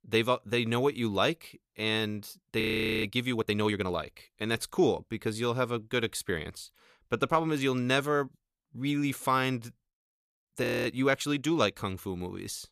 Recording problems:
audio freezing; at 2.5 s and at 11 s

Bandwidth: 14.5 kHz